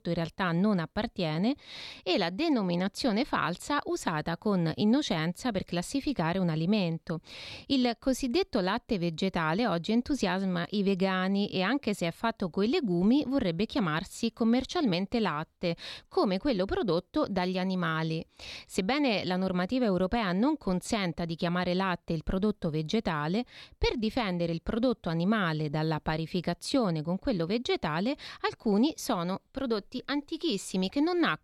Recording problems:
none

